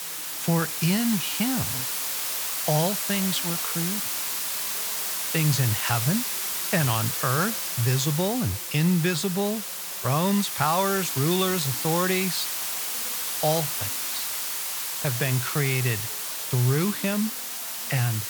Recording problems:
hiss; loud; throughout; 1 dB below the speech
voice in the background; faint; throughout; 25 dB below the speech

